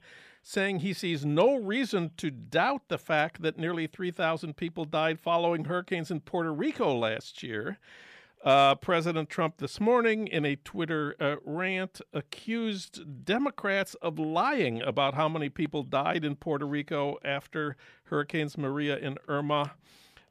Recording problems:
none

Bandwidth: 14.5 kHz